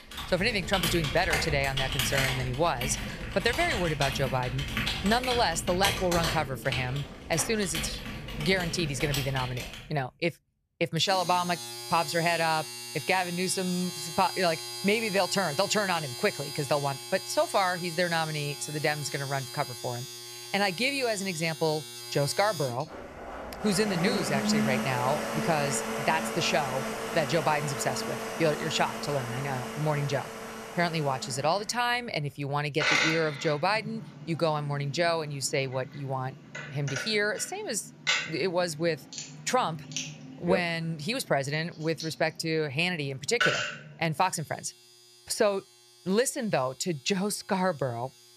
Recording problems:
household noises; loud; throughout; 4 dB below the speech

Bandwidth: 14.5 kHz